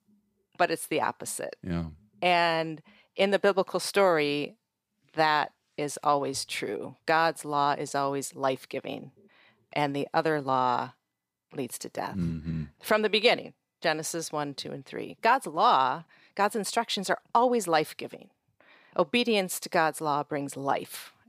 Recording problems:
none

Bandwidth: 15 kHz